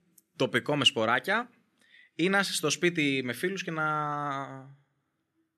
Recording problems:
none

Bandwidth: 13.5 kHz